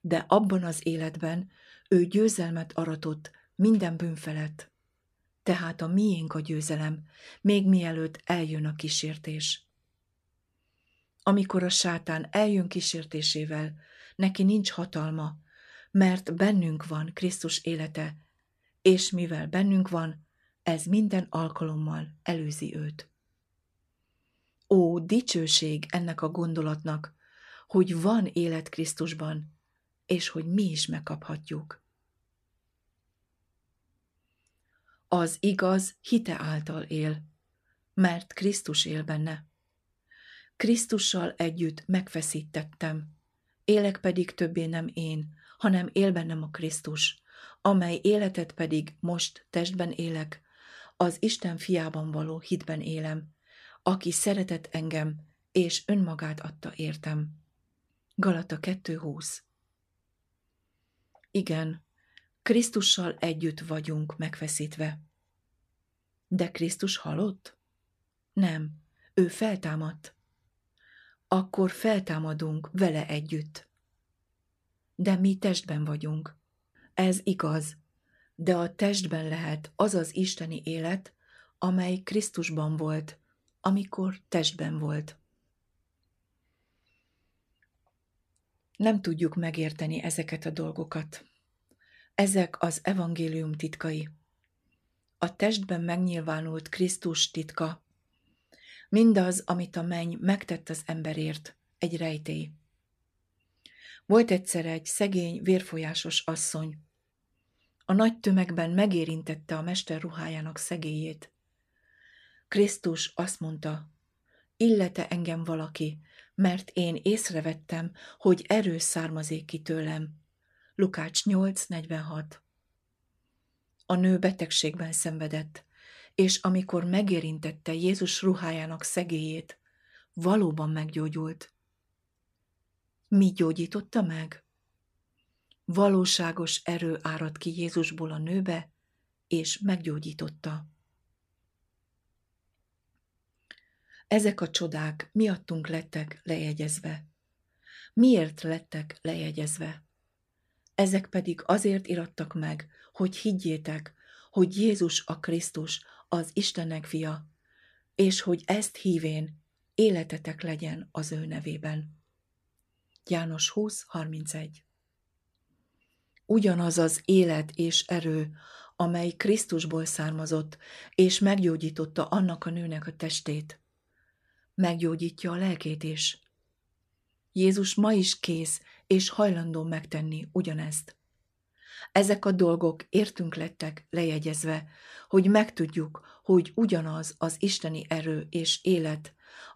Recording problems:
none

